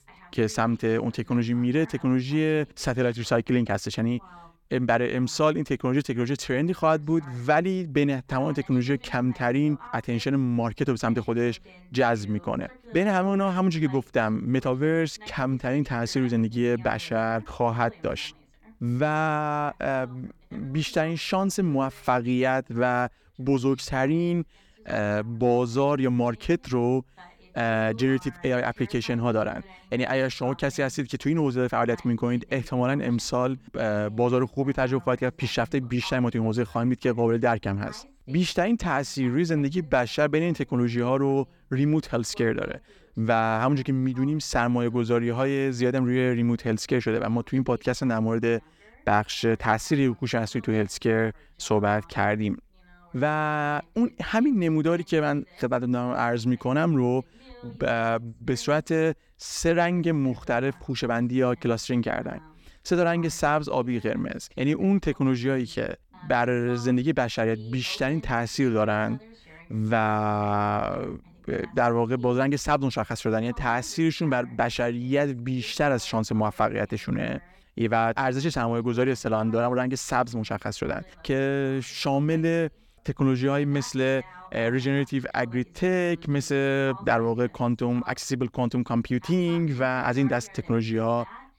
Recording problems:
voice in the background; faint; throughout; 25 dB below the speech

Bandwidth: 17.5 kHz